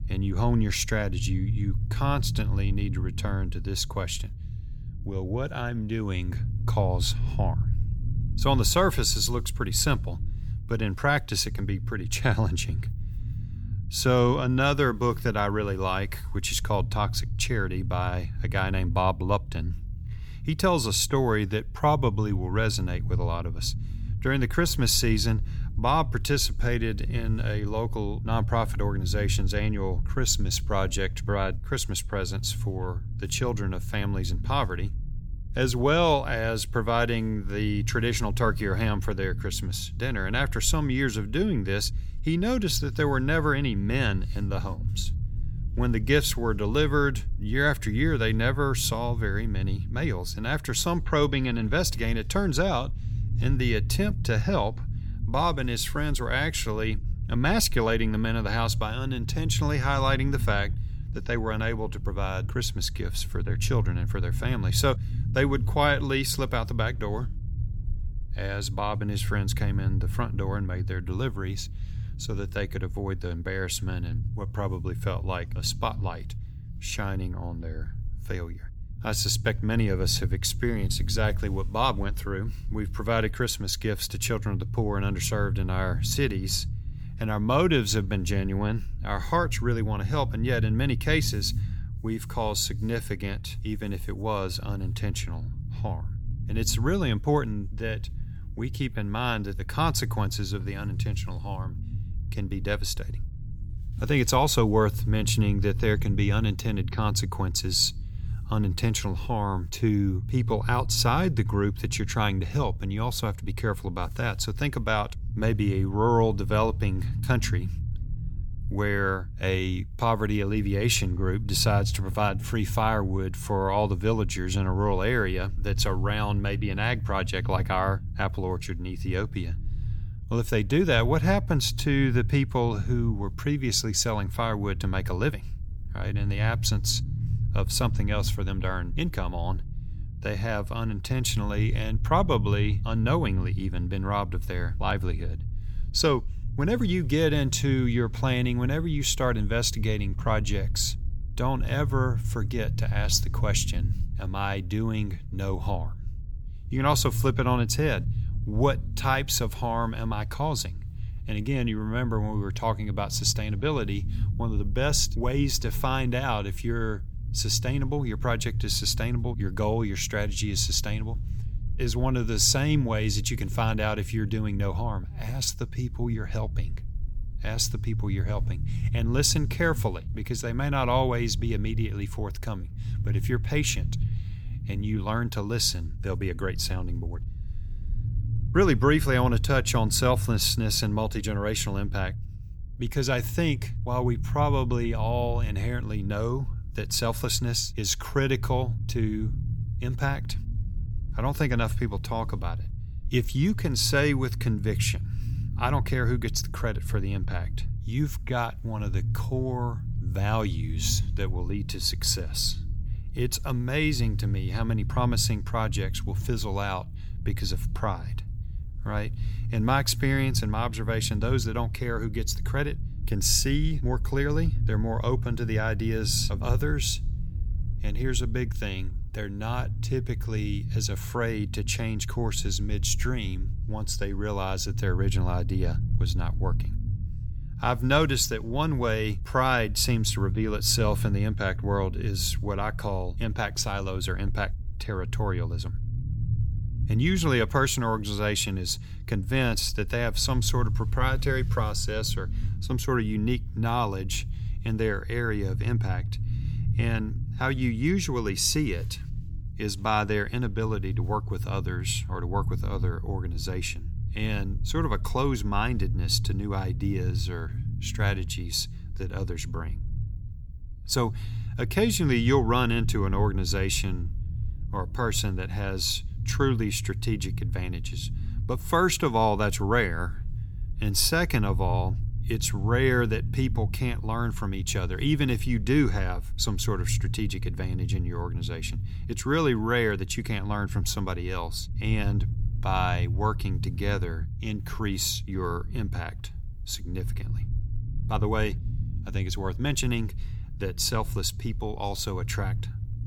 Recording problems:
low rumble; noticeable; throughout; 20 dB below the speech

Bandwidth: 18.5 kHz